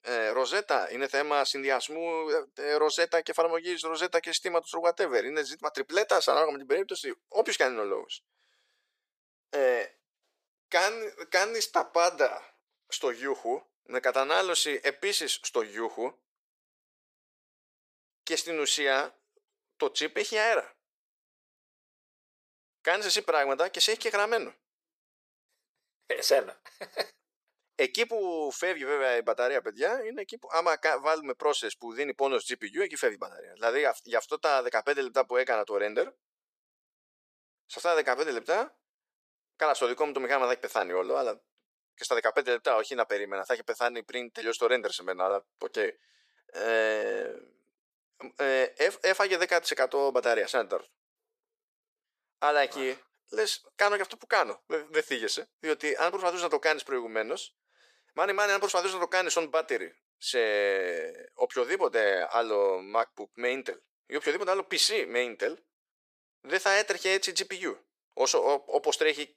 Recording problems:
thin; very; fading below 450 Hz

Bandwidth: 14.5 kHz